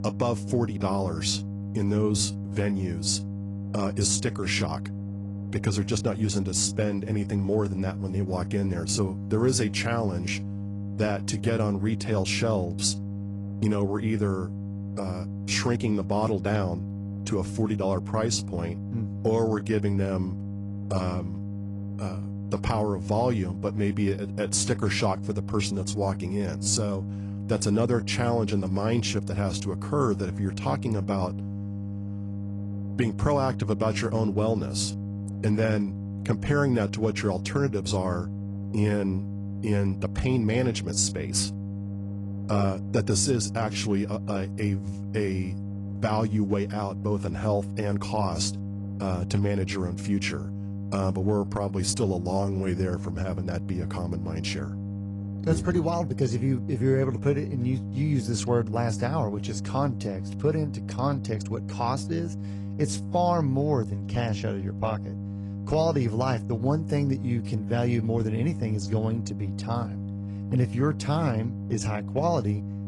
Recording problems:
garbled, watery; slightly; nothing above 10 kHz
electrical hum; noticeable; throughout; 50 Hz, 15 dB below the speech

